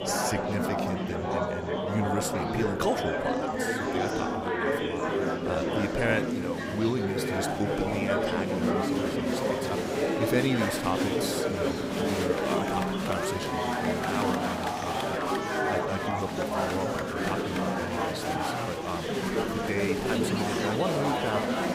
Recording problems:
murmuring crowd; very loud; throughout; 5 dB above the speech

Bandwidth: 15.5 kHz